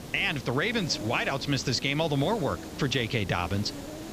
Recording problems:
high frequencies cut off; noticeable; nothing above 8 kHz
hiss; noticeable; throughout; 10 dB below the speech

